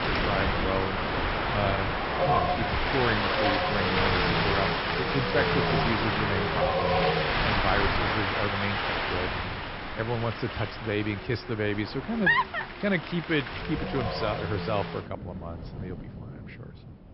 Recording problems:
high frequencies cut off; noticeable; nothing above 5.5 kHz
wind in the background; very loud; throughout; 4 dB above the speech

